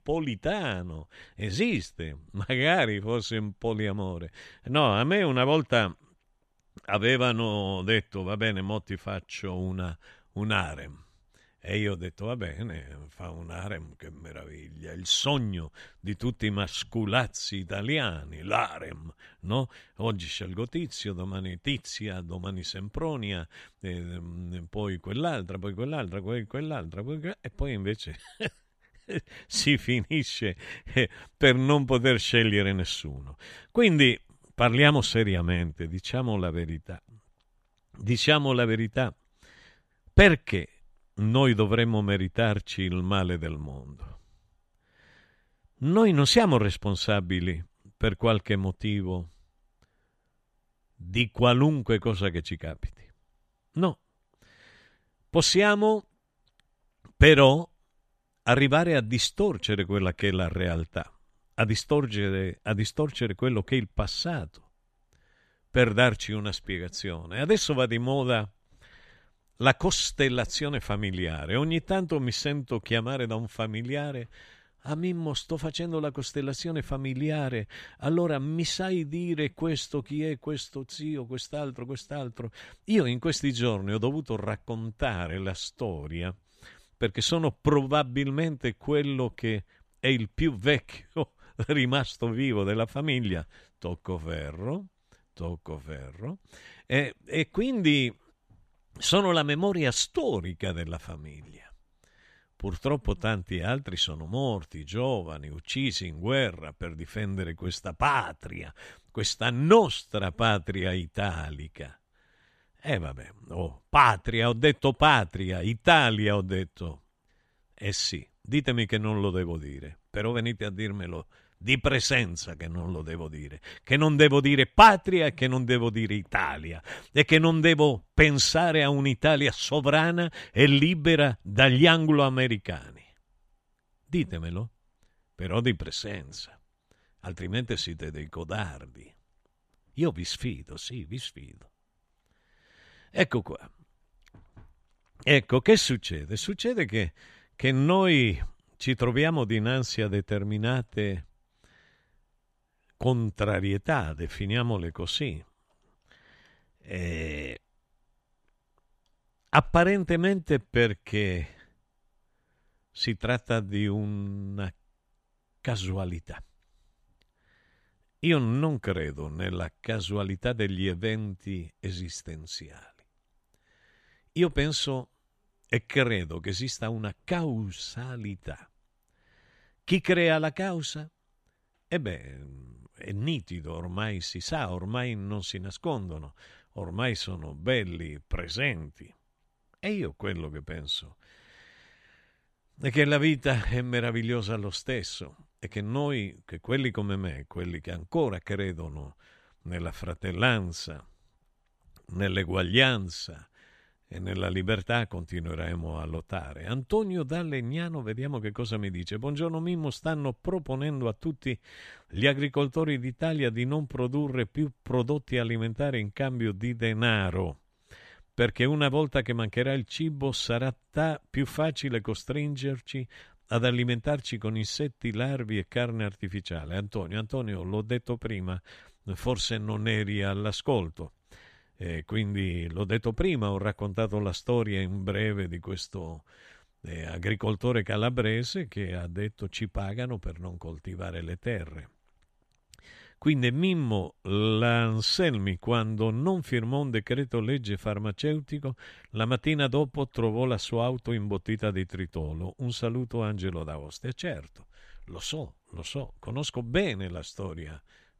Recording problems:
none

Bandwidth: 14 kHz